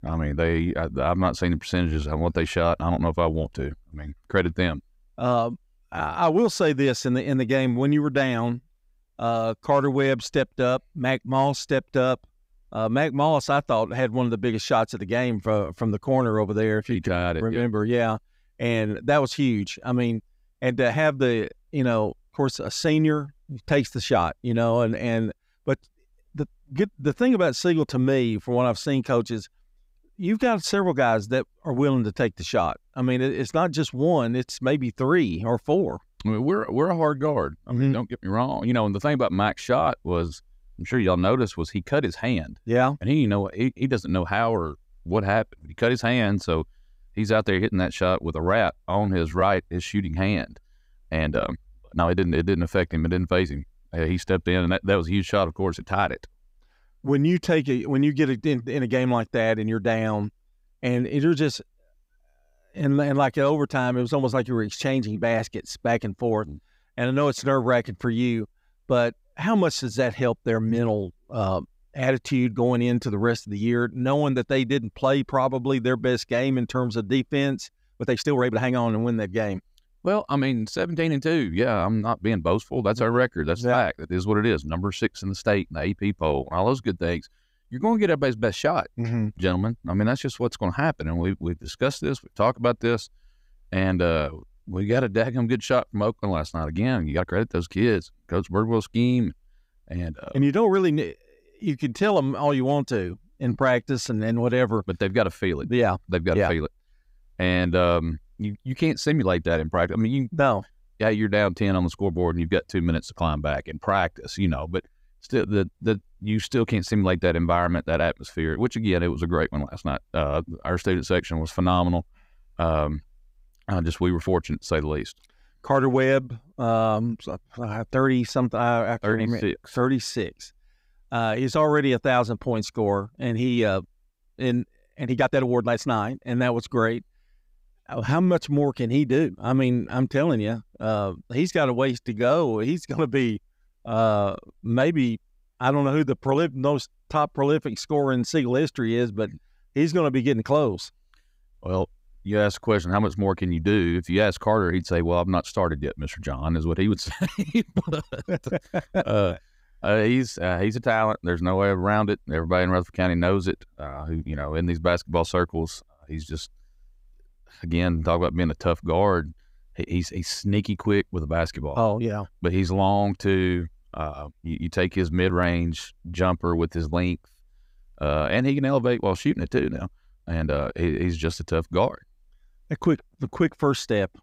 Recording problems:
uneven, jittery; strongly; from 49 s to 3:01

